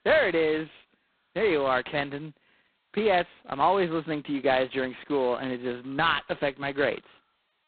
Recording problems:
phone-call audio; poor line; nothing above 4 kHz

